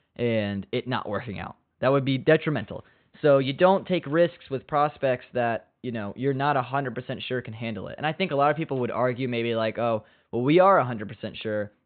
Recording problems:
high frequencies cut off; severe; nothing above 4 kHz

